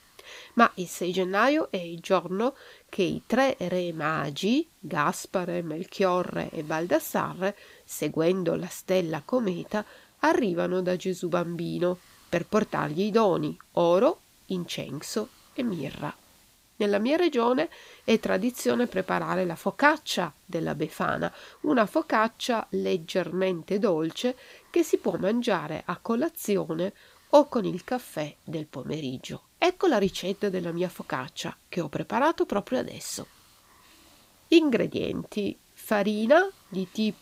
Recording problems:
hiss; faint; throughout; 30 dB below the speech

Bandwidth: 15.5 kHz